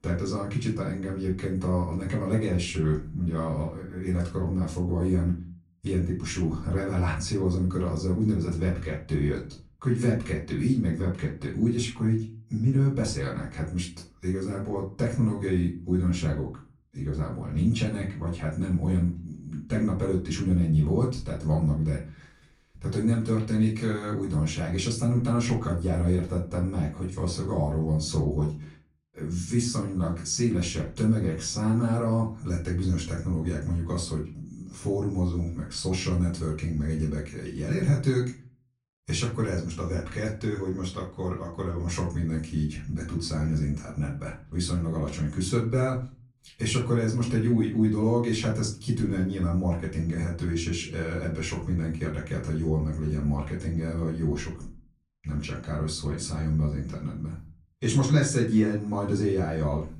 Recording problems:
off-mic speech; far
room echo; slight; dies away in 0.4 s

